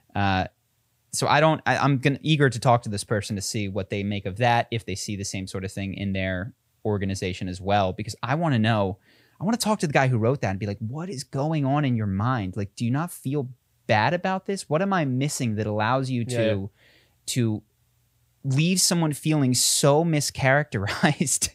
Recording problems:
none

